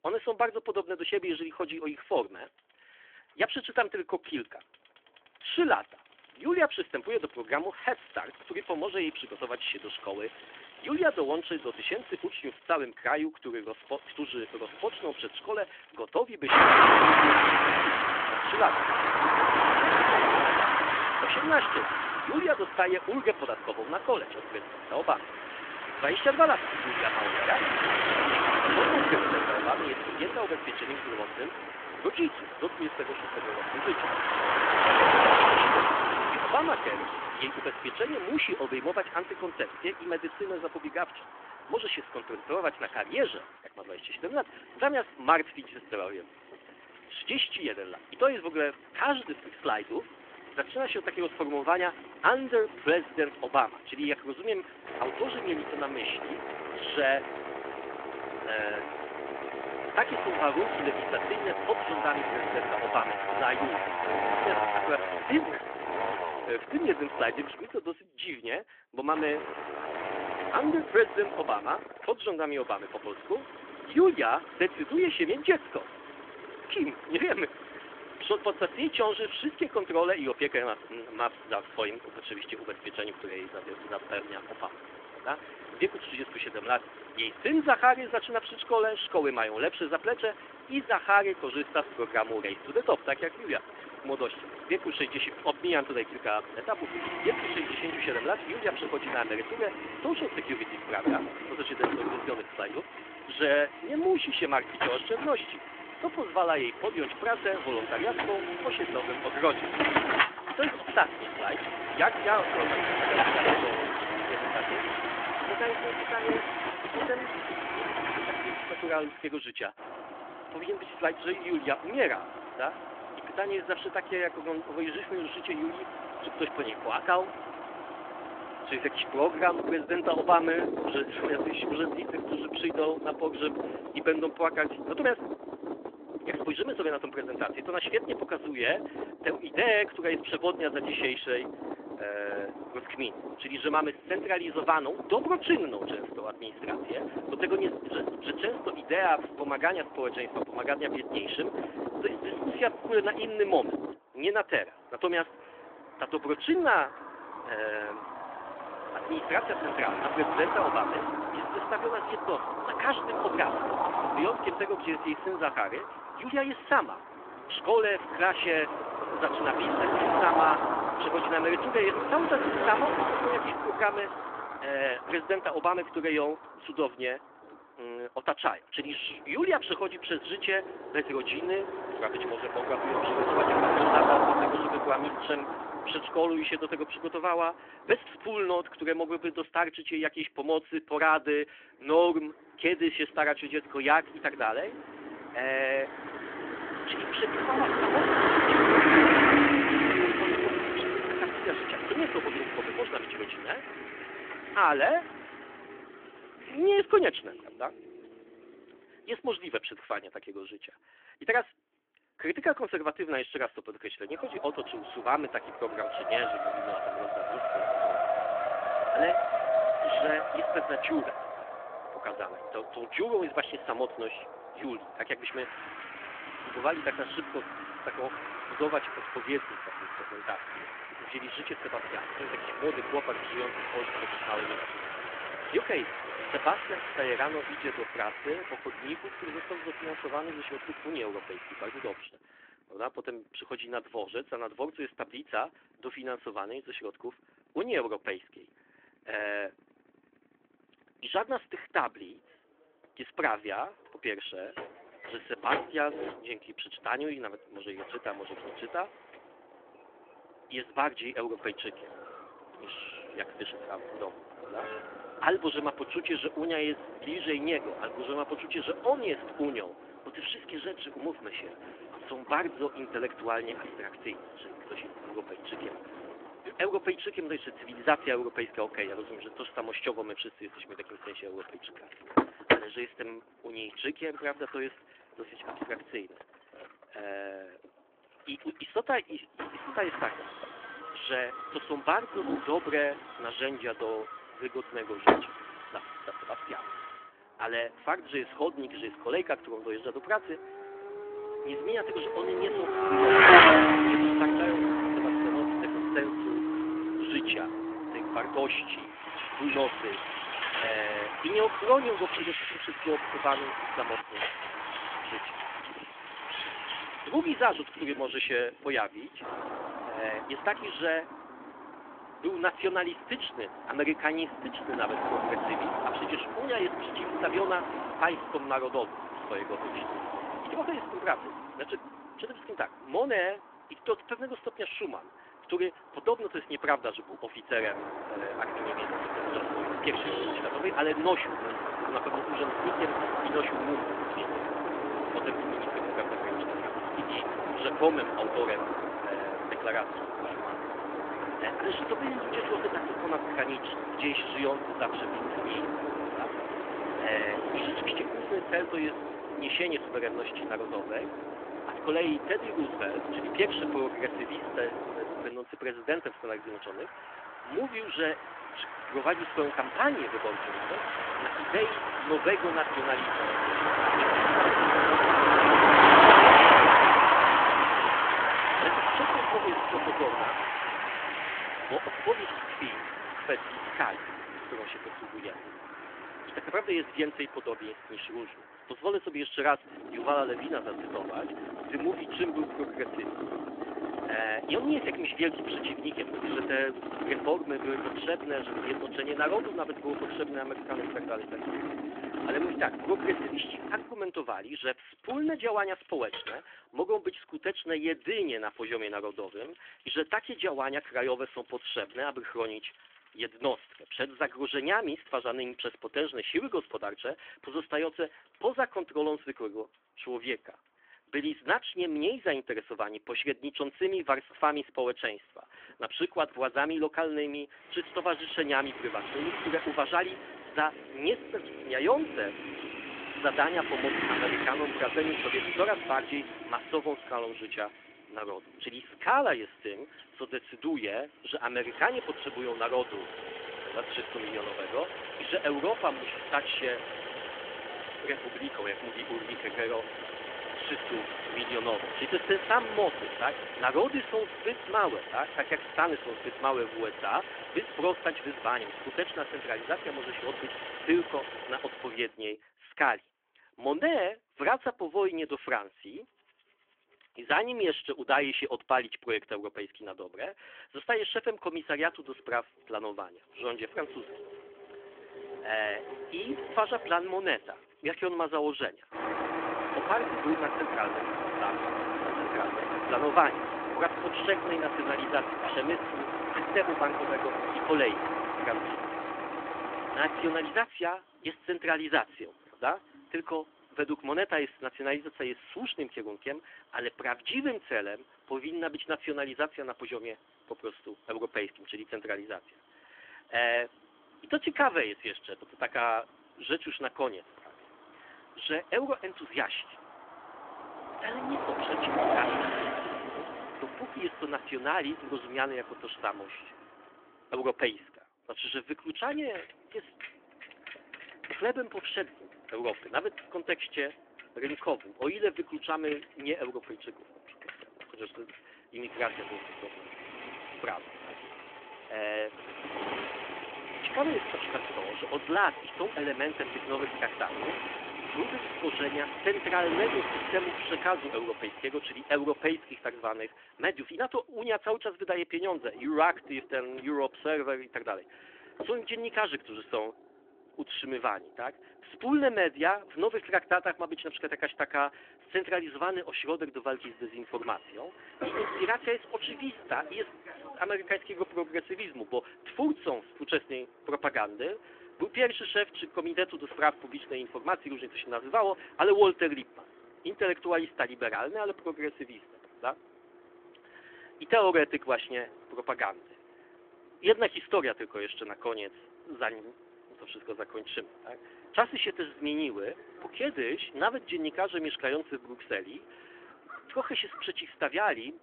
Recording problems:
phone-call audio; nothing above 3.5 kHz
traffic noise; very loud; throughout; 2 dB above the speech

